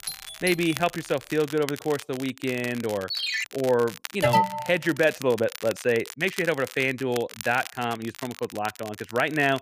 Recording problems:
crackle, like an old record; noticeable; 15 dB below the speech
doorbell; noticeable; at the start; peak 8 dB below the speech
phone ringing; loud; at 3 s; peak level with the speech
alarm; loud; at 4 s; peak 5 dB above the speech

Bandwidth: 15 kHz